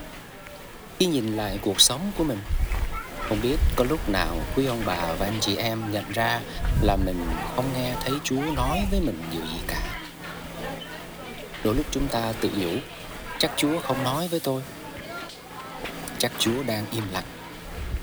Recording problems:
hiss; loud; throughout; 7 dB below the speech

